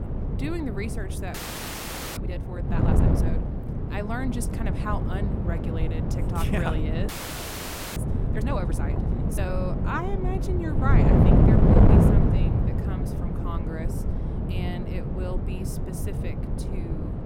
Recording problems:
wind noise on the microphone; heavy; 2 dB above the speech
audio freezing; at 1.5 s for 1 s and at 7 s for 1 s

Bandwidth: 16.5 kHz